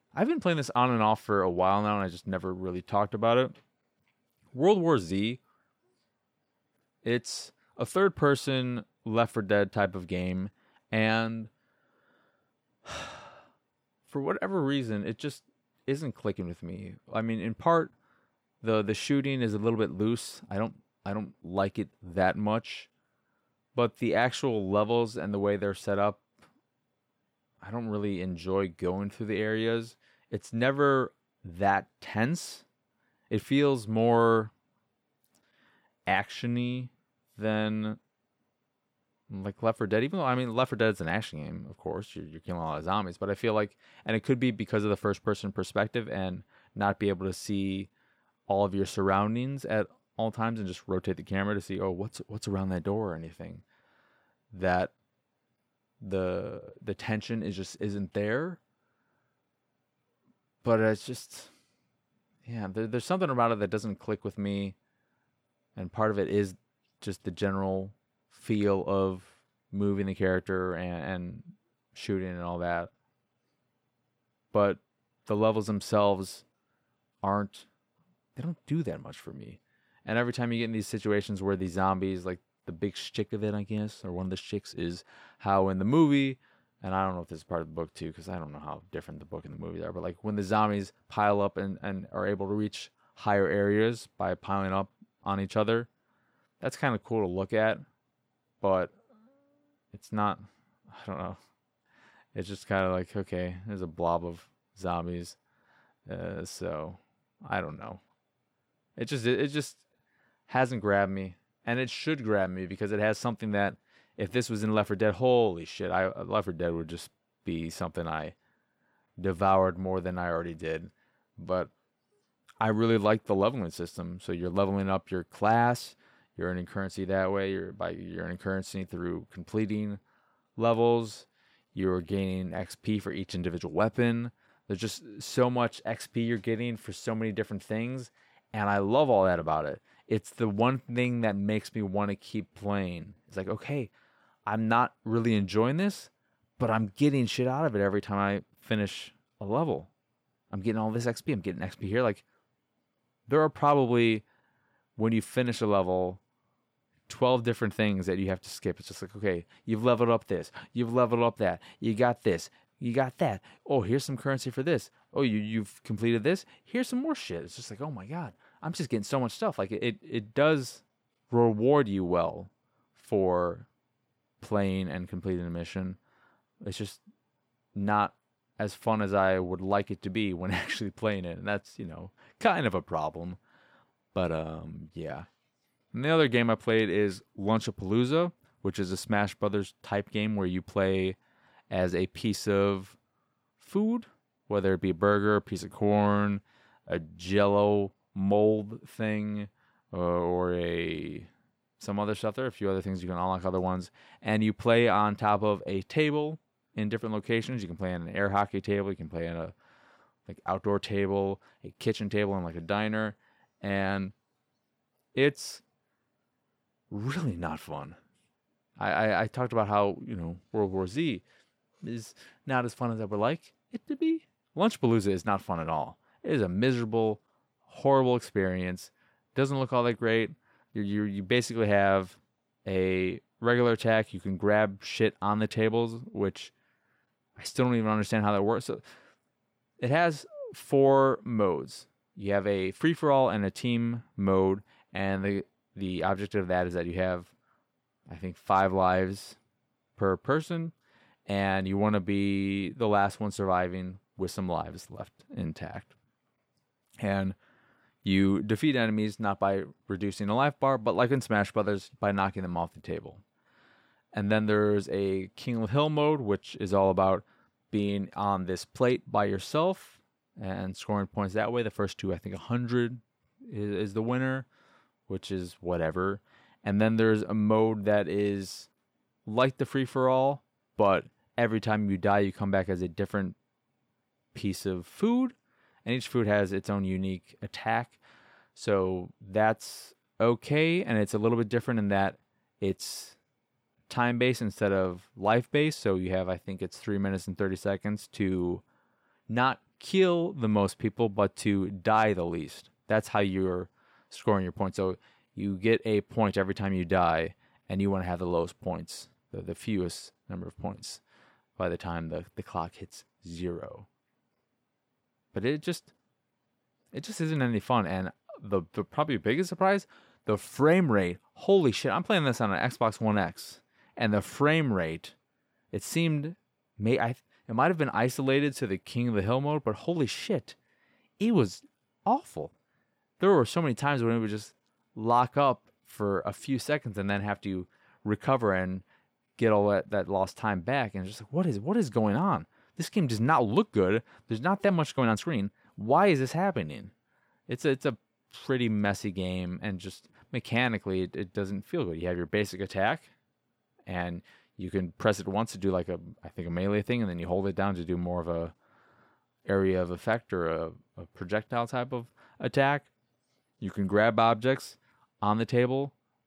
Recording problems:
uneven, jittery; strongly; from 33 s to 5:46

